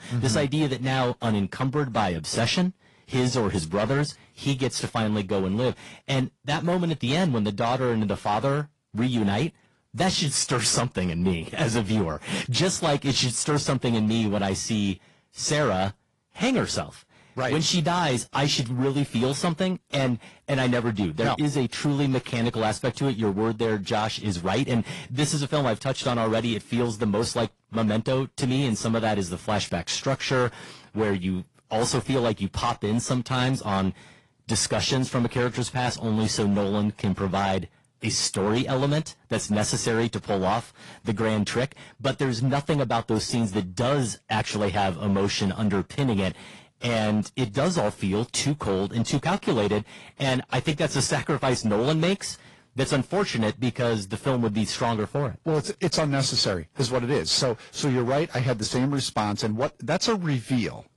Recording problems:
distortion; slight; 7% of the sound clipped
garbled, watery; slightly; nothing above 10.5 kHz

